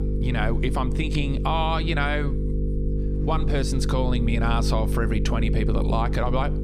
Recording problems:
electrical hum; loud; throughout; 50 Hz, 8 dB below the speech

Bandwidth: 15 kHz